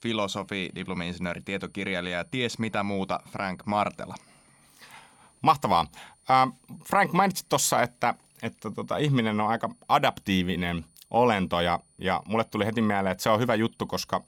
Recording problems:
high-pitched whine; faint; throughout; 9.5 kHz, 35 dB below the speech

